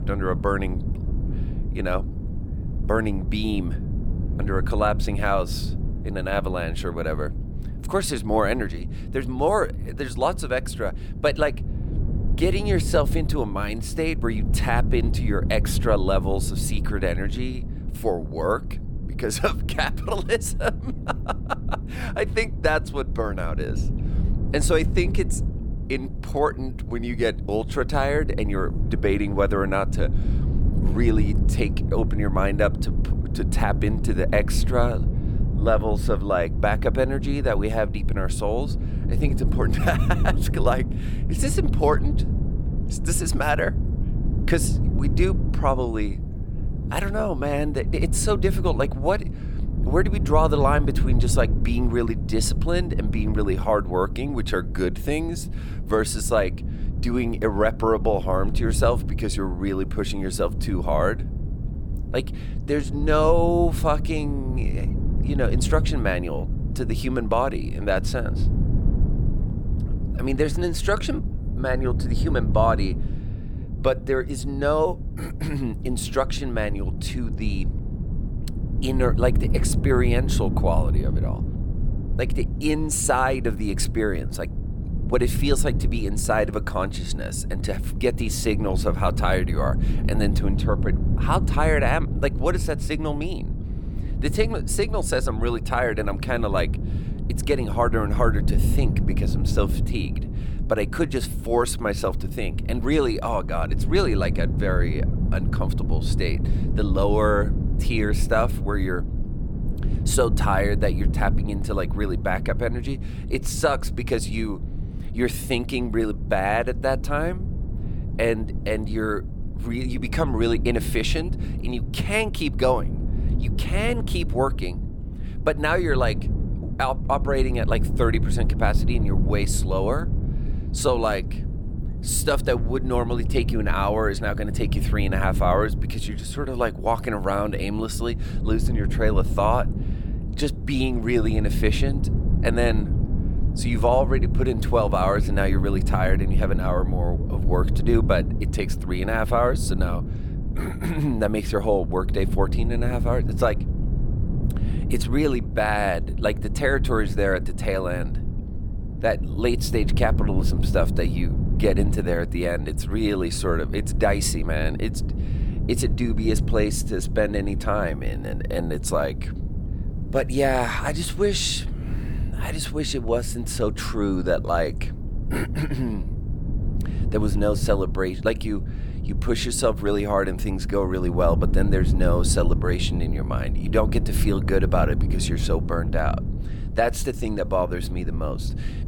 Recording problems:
wind noise on the microphone; occasional gusts; 15 dB below the speech

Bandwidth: 18 kHz